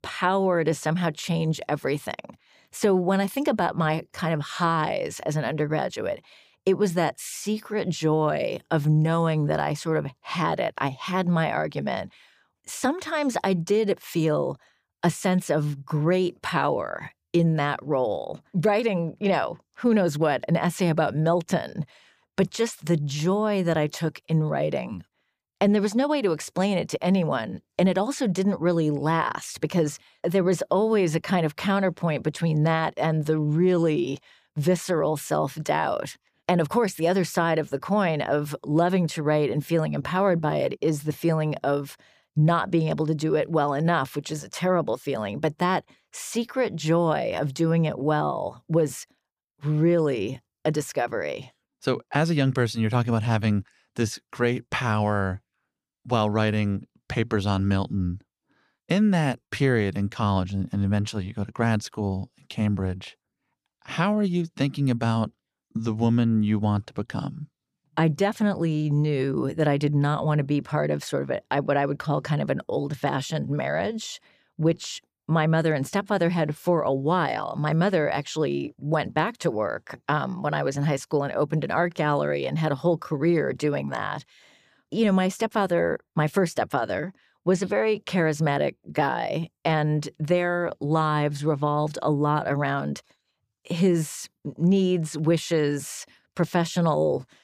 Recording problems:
none

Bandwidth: 15 kHz